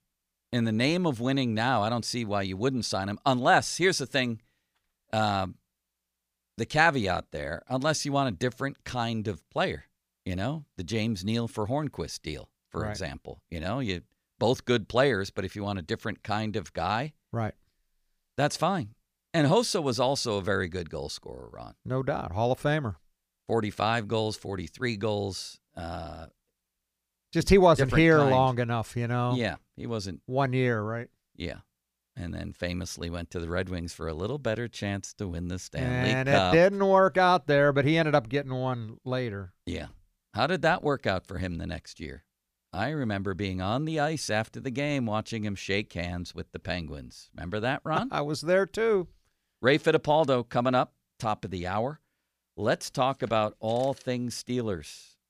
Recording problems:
none

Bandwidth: 15 kHz